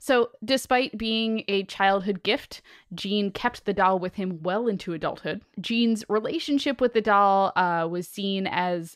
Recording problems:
none

